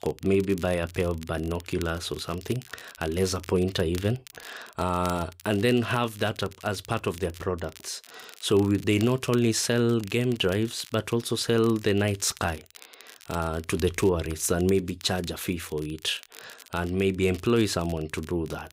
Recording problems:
crackle, like an old record; faint; 20 dB below the speech

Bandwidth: 15.5 kHz